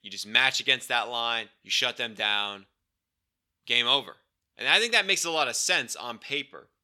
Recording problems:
thin; somewhat; fading below 500 Hz

